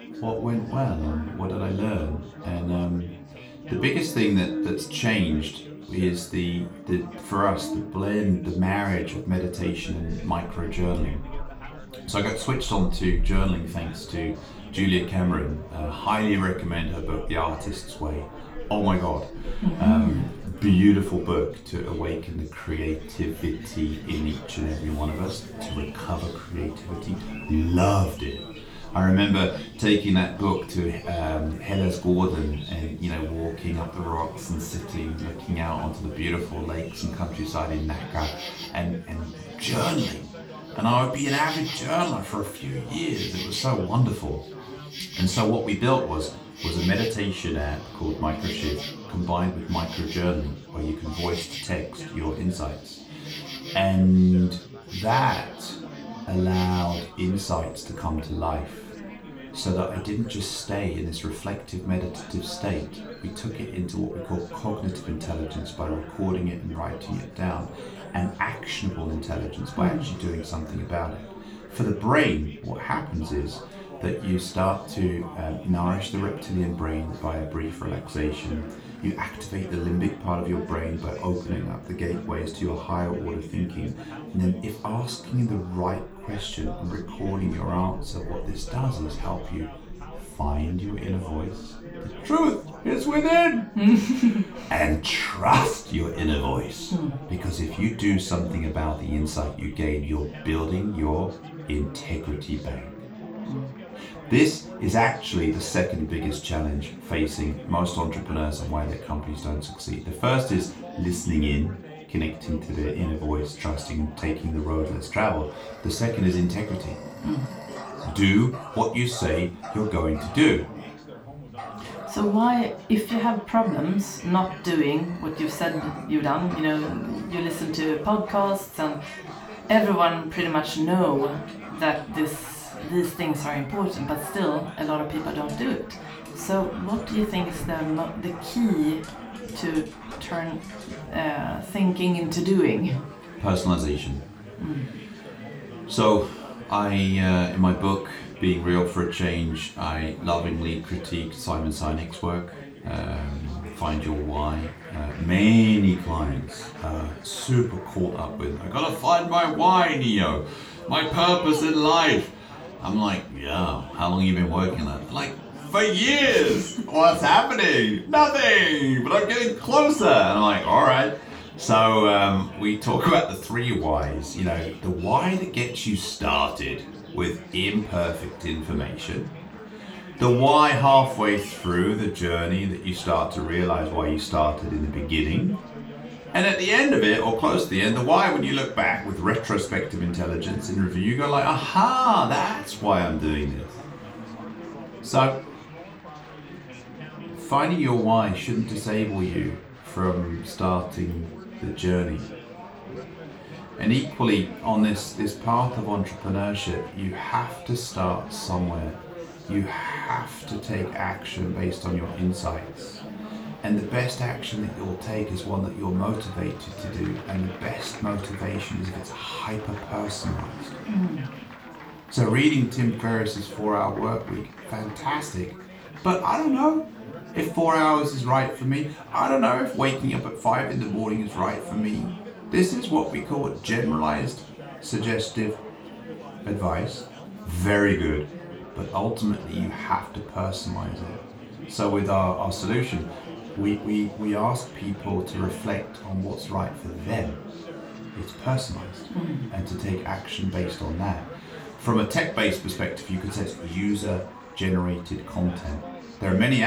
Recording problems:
off-mic speech; far
room echo; slight; dies away in 0.3 s
animal sounds; noticeable; throughout; 15 dB below the speech
chatter from many people; noticeable; throughout; 15 dB below the speech
abrupt cut into speech; at the end

